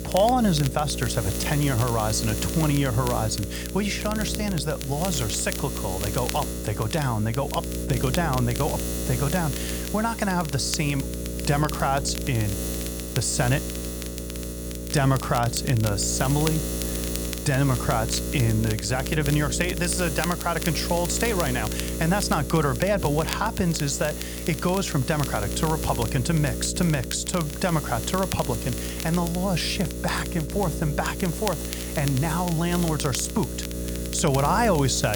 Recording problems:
electrical hum; loud; throughout; 60 Hz, 9 dB below the speech
crackle, like an old record; noticeable; 15 dB below the speech
abrupt cut into speech; at the end

